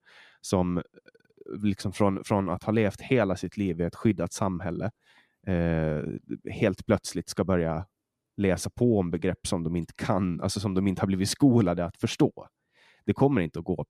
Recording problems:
none

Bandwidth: 14 kHz